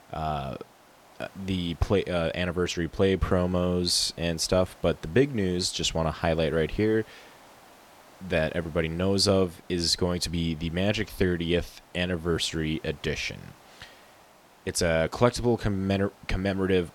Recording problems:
hiss; faint; throughout; 25 dB below the speech

